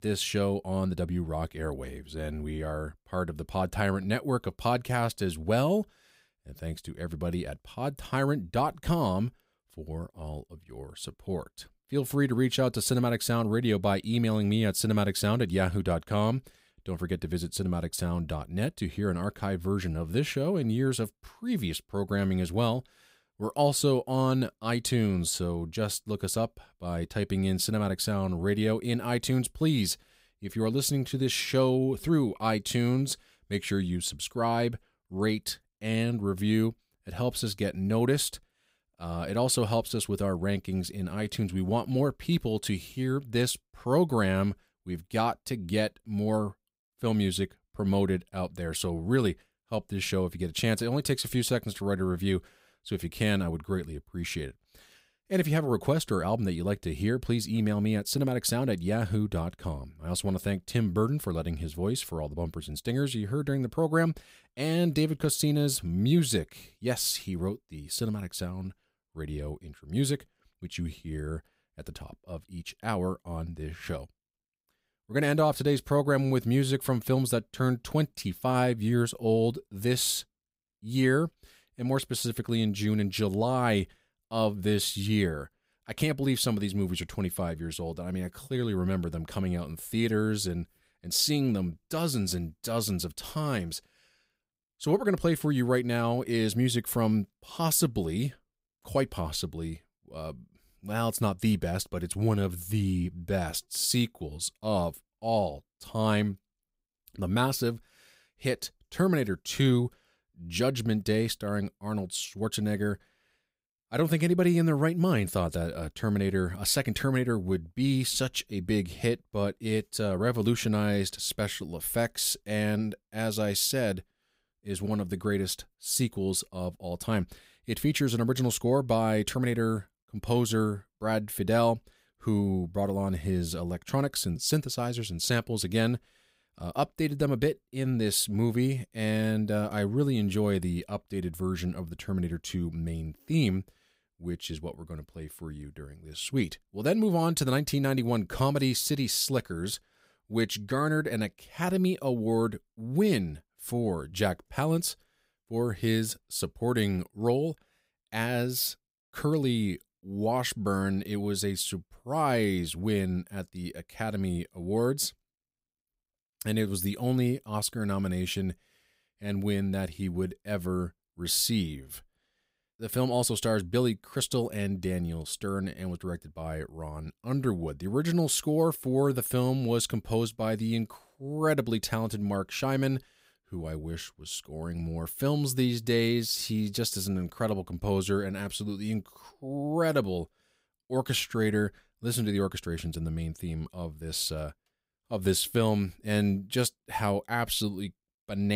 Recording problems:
abrupt cut into speech; at the end

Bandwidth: 15.5 kHz